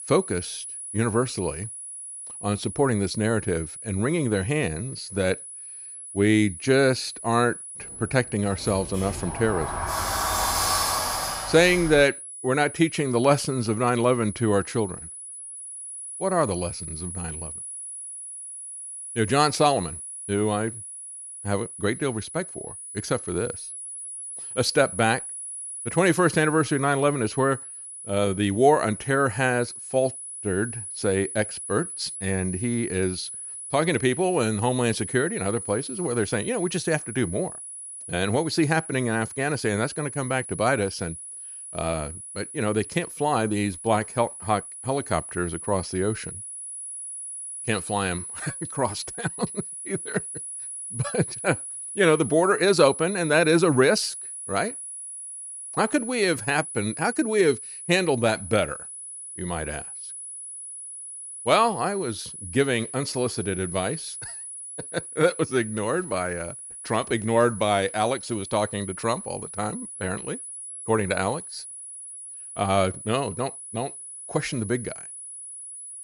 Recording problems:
high-pitched whine; loud; throughout; 10 kHz, 10 dB below the speech
door banging; loud; from 8.5 to 12 s; peak 3 dB above the speech

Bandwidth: 15.5 kHz